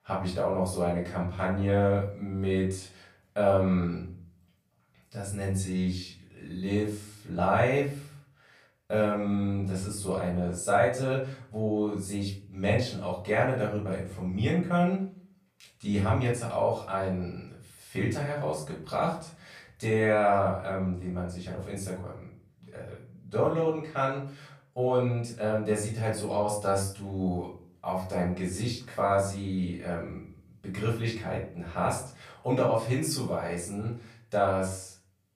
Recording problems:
off-mic speech; far
room echo; noticeable; dies away in 0.4 s

